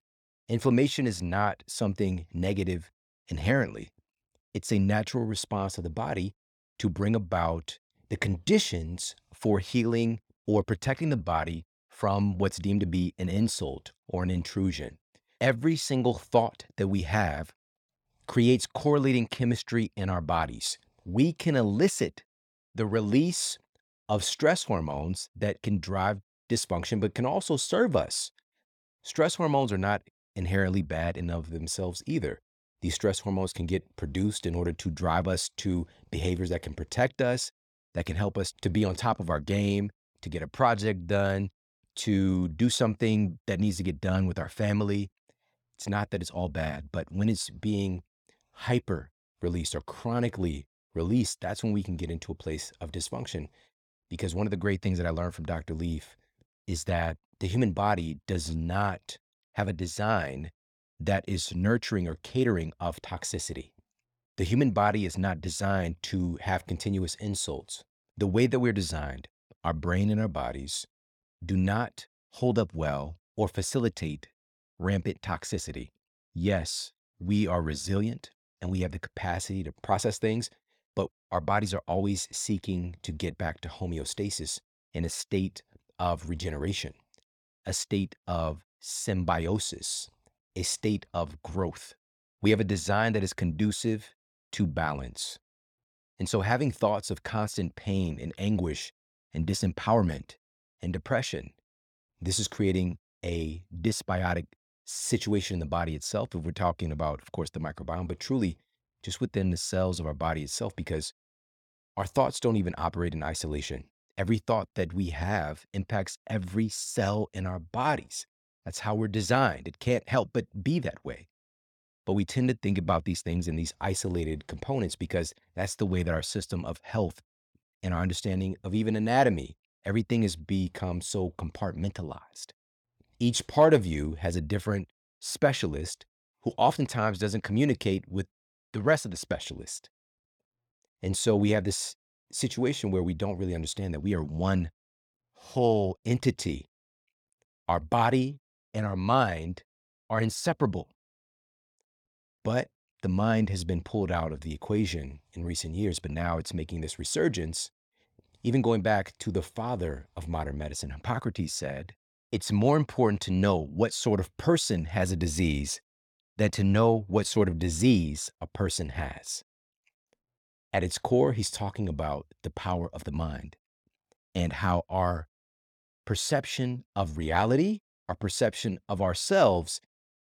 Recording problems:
none

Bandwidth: 18 kHz